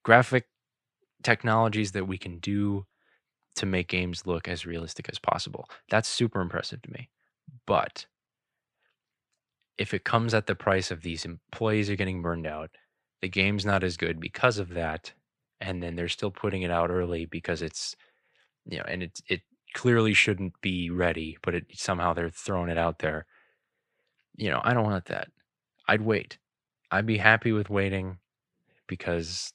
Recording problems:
none

